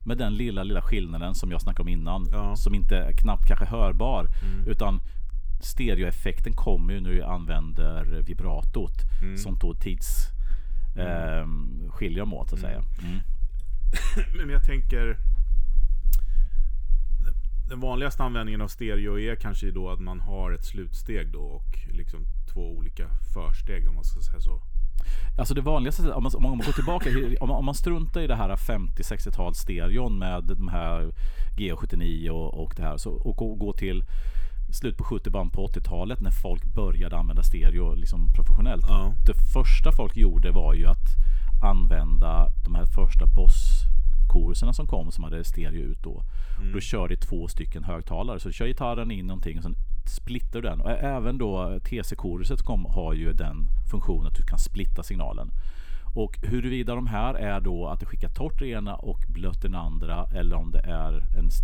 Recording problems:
low rumble; faint; throughout; 25 dB below the speech

